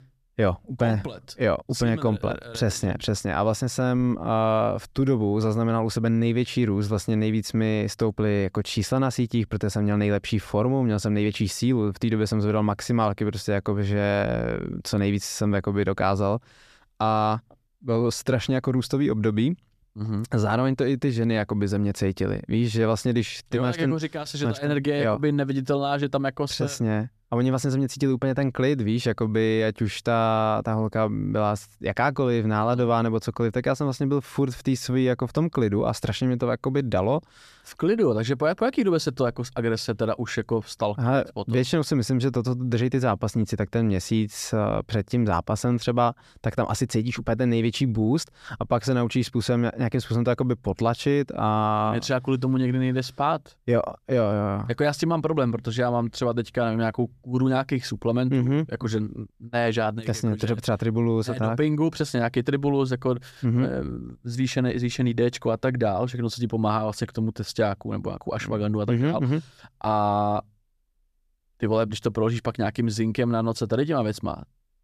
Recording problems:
none

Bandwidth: 14.5 kHz